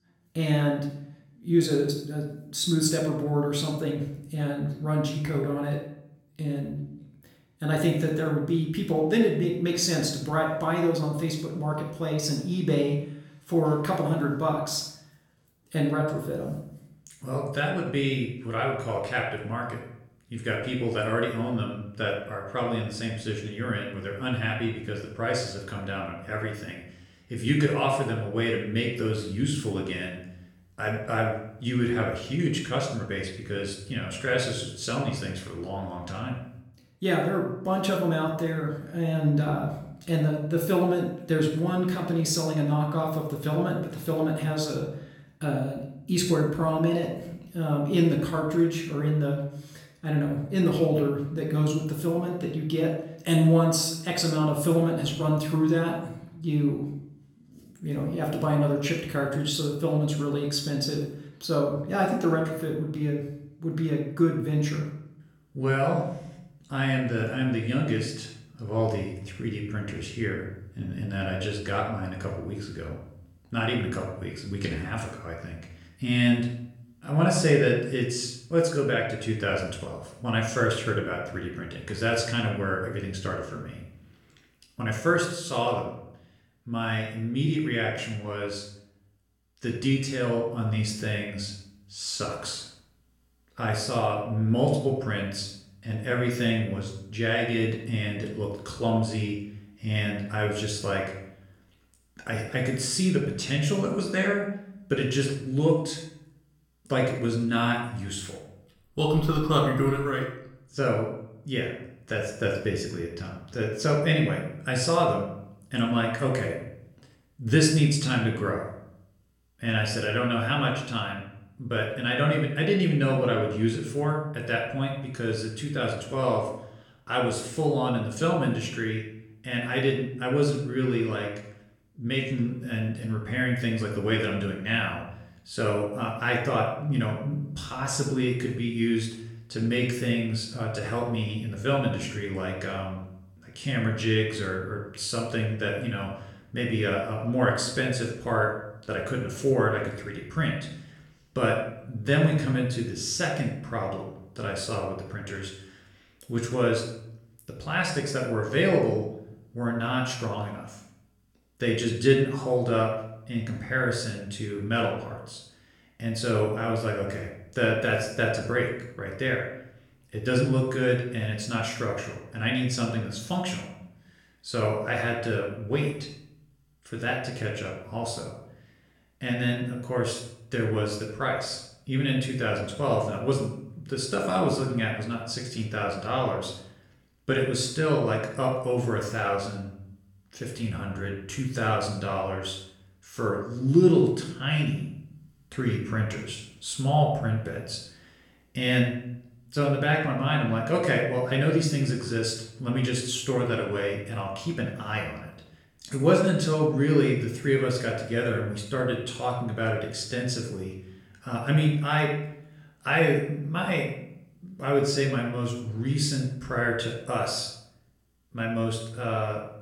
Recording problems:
room echo; noticeable; dies away in 0.6 s
off-mic speech; somewhat distant

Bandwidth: 17 kHz